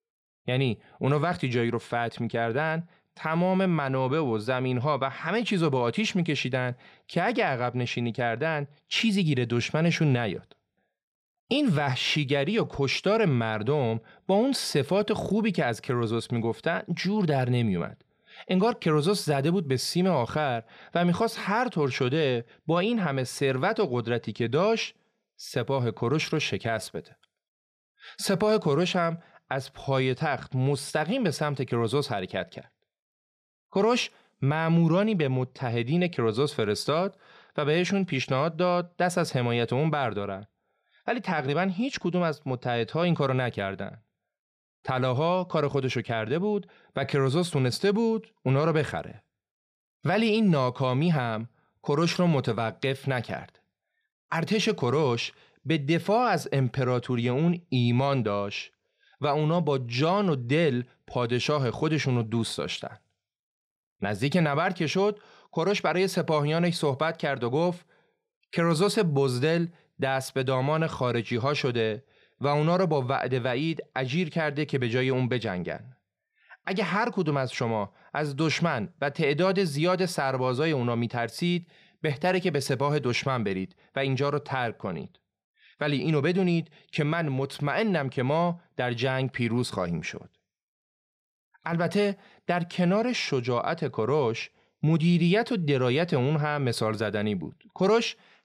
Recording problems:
none

